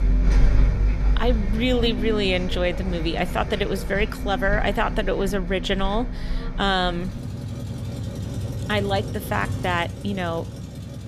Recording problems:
traffic noise; loud; throughout; 3 dB below the speech

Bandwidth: 14.5 kHz